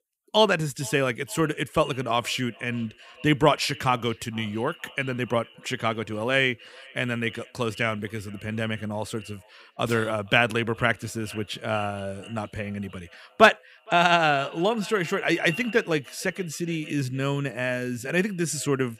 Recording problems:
echo of what is said; faint; throughout; 460 ms later, 20 dB below the speech

